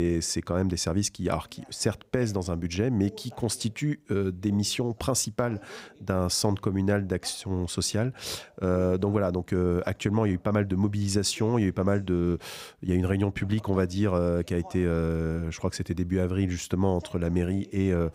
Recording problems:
voice in the background; faint; throughout; 25 dB below the speech
abrupt cut into speech; at the start

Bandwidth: 15.5 kHz